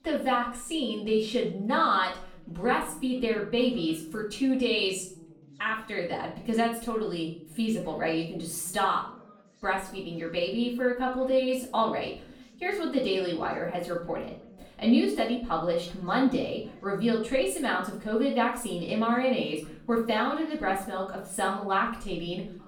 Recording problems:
off-mic speech; far
room echo; noticeable; dies away in 0.4 s
background chatter; faint; throughout; 3 voices, 25 dB below the speech

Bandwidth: 17.5 kHz